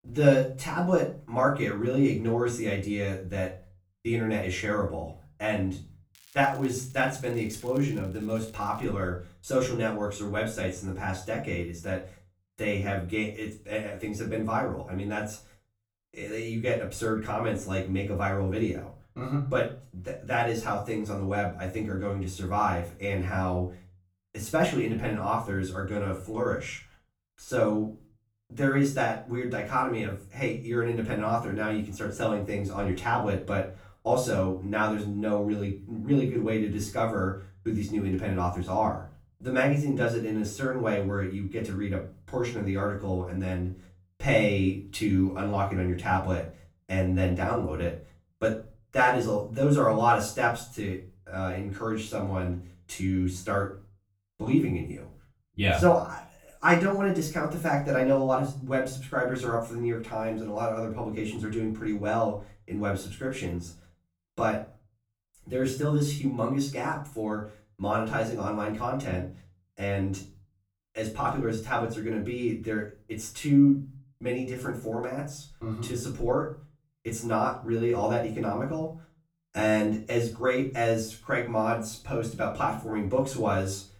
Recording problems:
off-mic speech; far
room echo; slight; dies away in 0.3 s
crackling; faint; from 6 to 9 s; 25 dB below the speech

